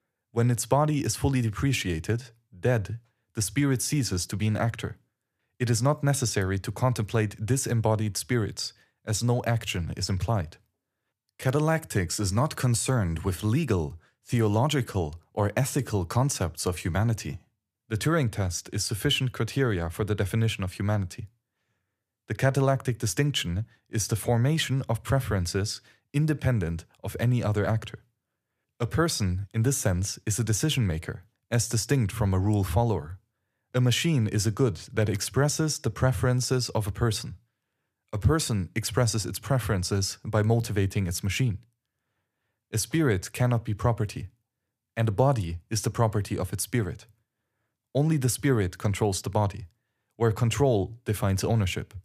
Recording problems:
none

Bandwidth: 14.5 kHz